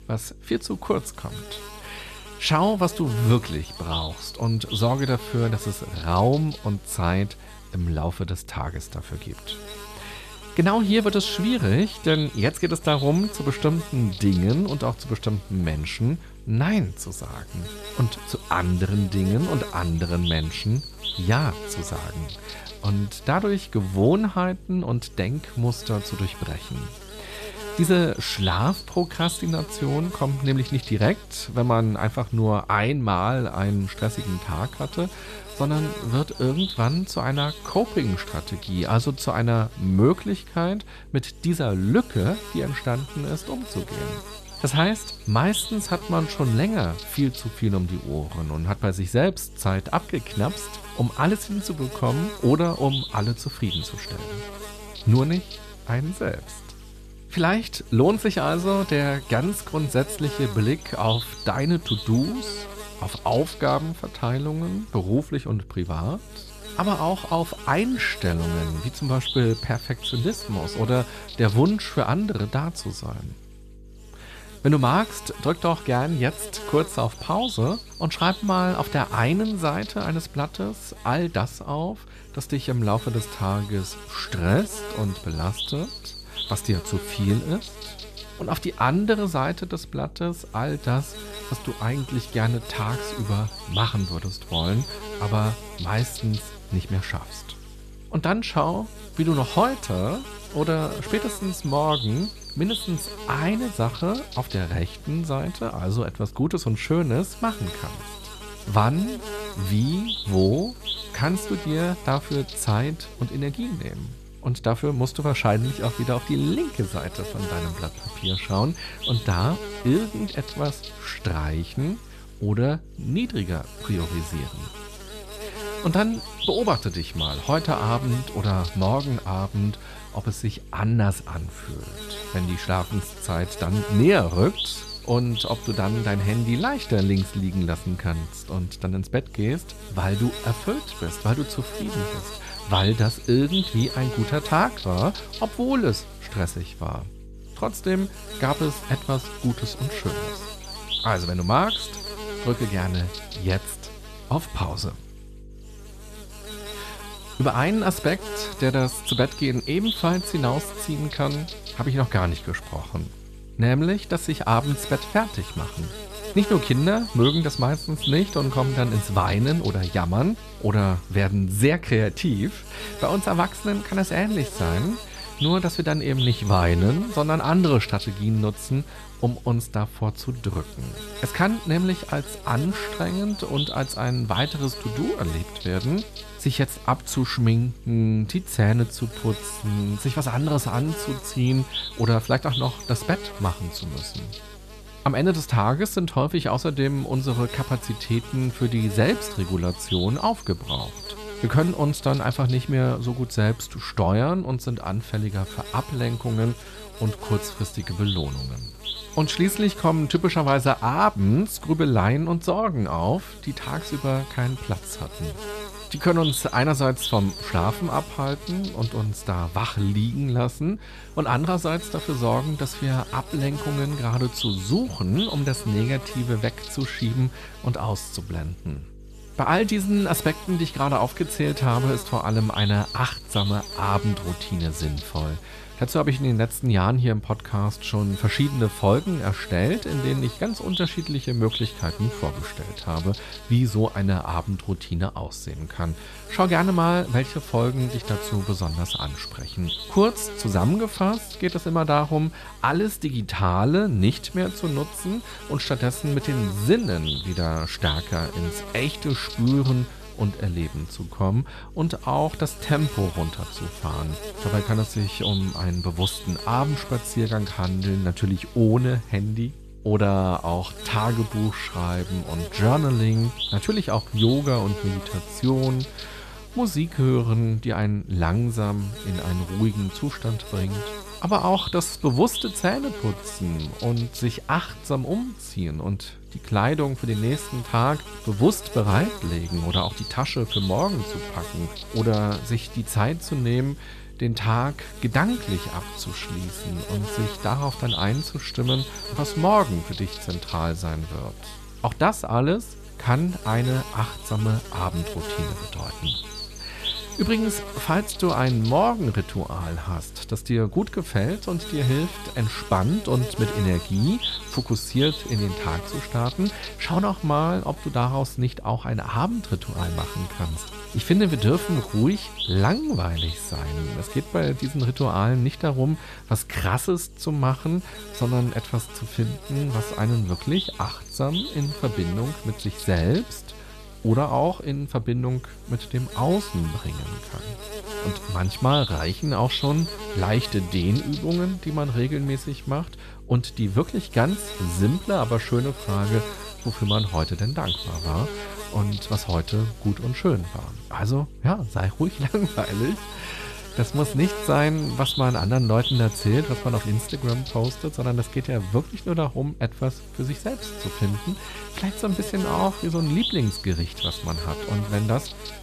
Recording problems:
electrical hum; loud; throughout; 50 Hz, 7 dB below the speech

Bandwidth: 14 kHz